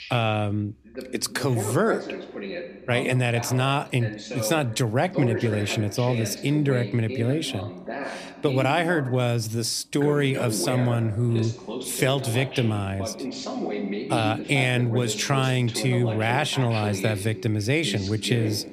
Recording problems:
voice in the background; loud; throughout; 9 dB below the speech

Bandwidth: 14.5 kHz